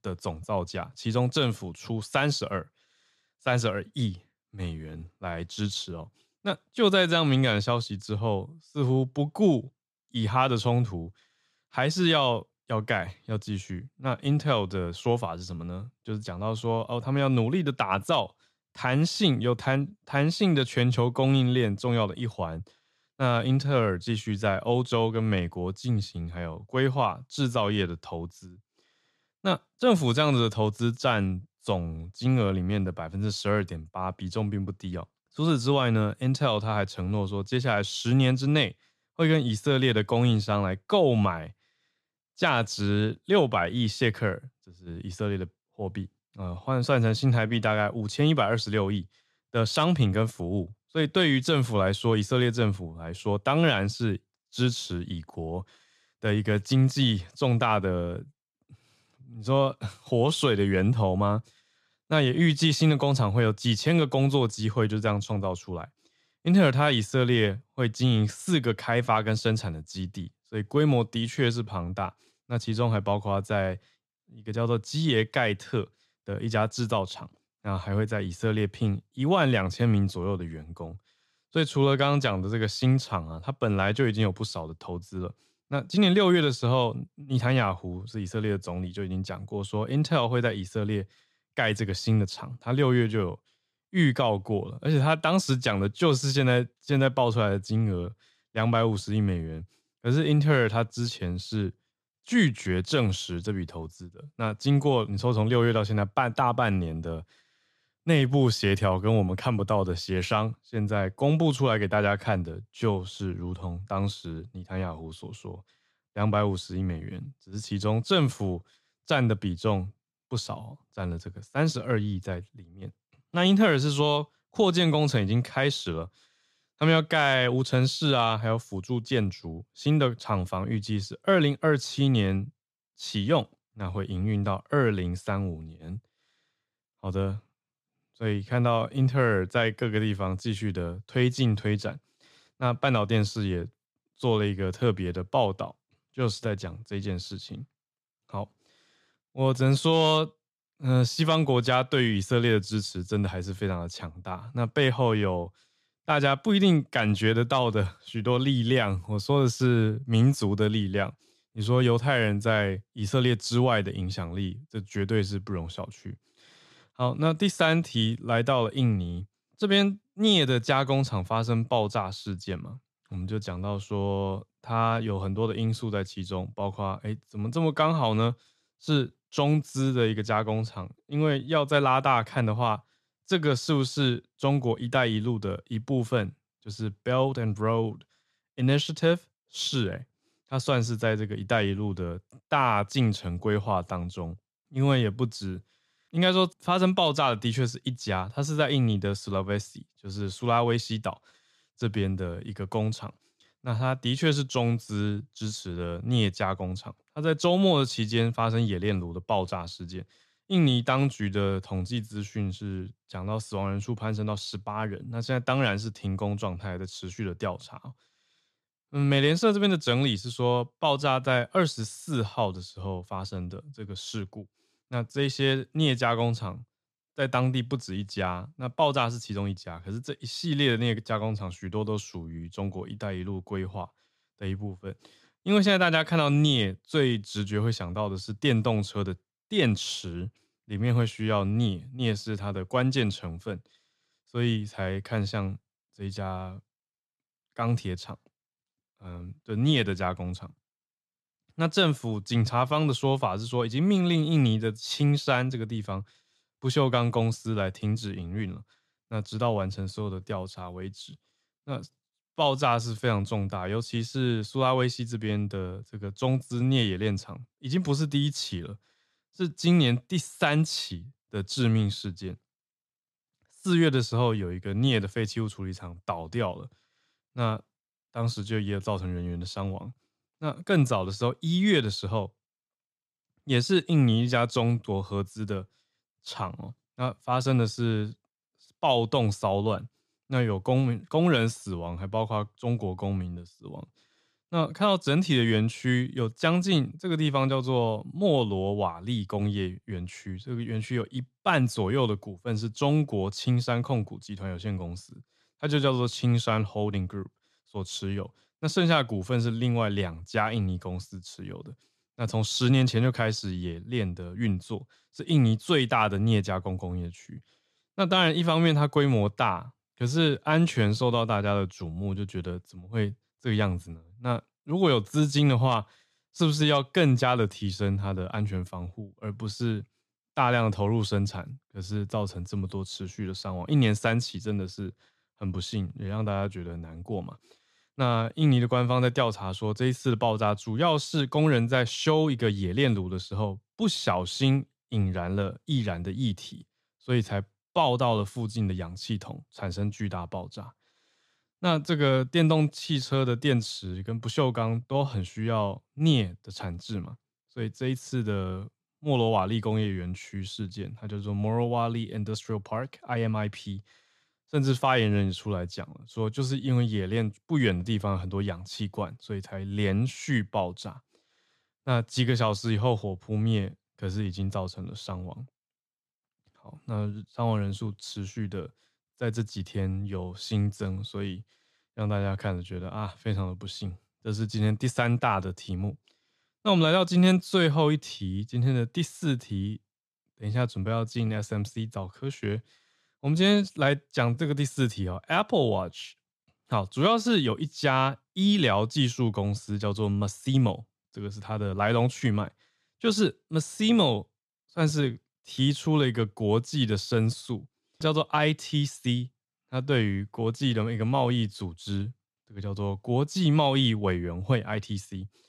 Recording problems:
none

